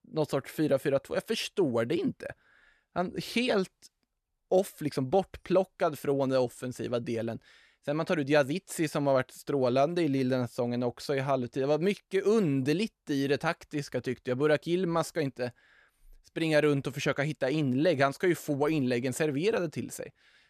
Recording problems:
none

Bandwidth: 13.5 kHz